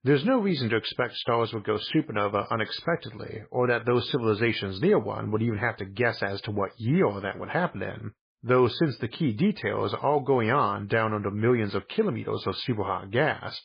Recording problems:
garbled, watery; badly

